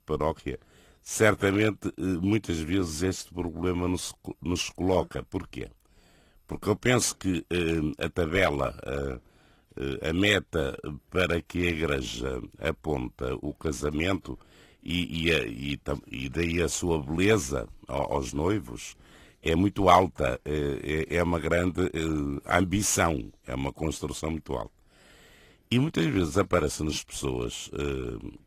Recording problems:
garbled, watery; slightly

